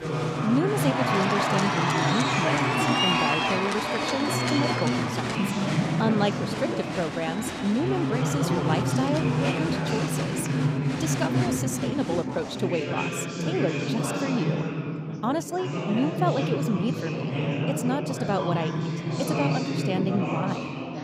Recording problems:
chatter from many people; very loud; throughout; 3 dB above the speech

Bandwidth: 15.5 kHz